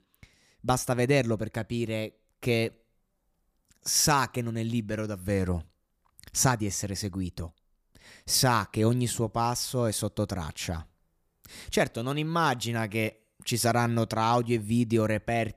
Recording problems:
none

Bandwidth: 15 kHz